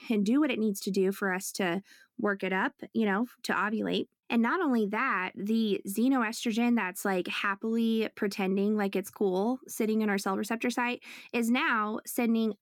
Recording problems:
none

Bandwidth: 17.5 kHz